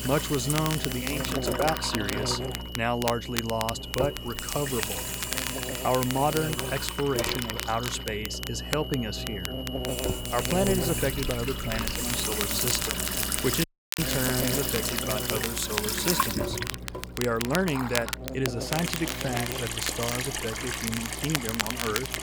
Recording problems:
electrical hum; loud; throughout; 60 Hz, 10 dB below the speech
high-pitched whine; loud; until 15 s; 3 kHz, 10 dB below the speech
household noises; loud; throughout; 1 dB below the speech
crackle, like an old record; loud; 5 dB below the speech
audio cutting out; at 14 s

